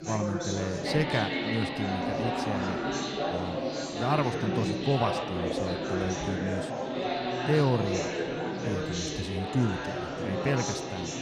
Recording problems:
chatter from many people; very loud; throughout; as loud as the speech

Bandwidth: 15.5 kHz